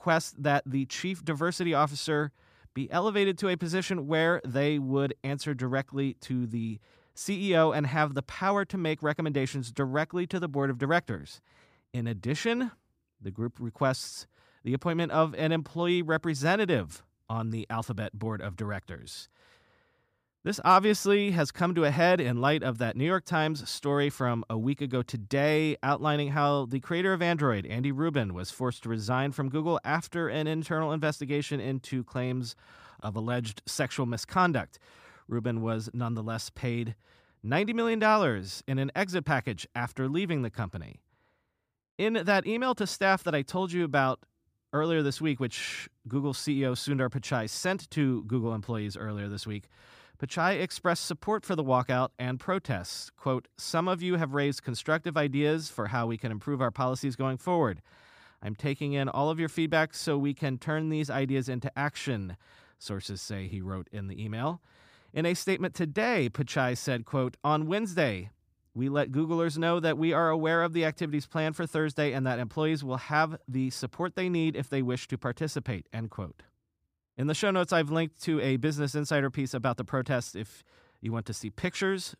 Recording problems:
none

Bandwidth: 15 kHz